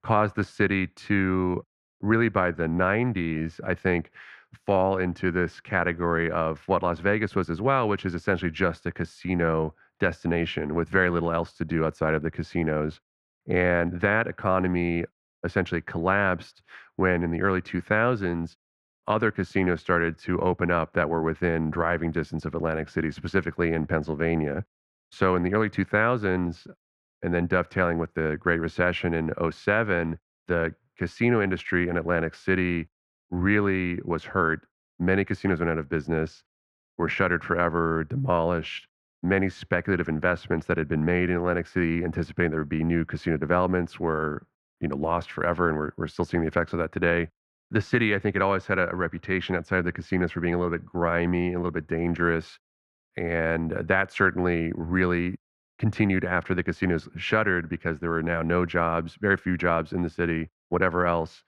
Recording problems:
muffled; very; fading above 3.5 kHz

